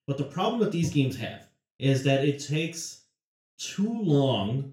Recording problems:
off-mic speech; far
room echo; slight; dies away in 0.3 s

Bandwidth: 16 kHz